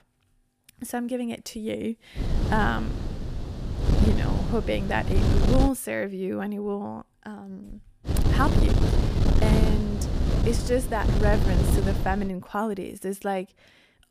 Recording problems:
wind noise on the microphone; heavy; from 2 to 5.5 s and from 8 to 12 s; 4 dB below the speech

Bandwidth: 14.5 kHz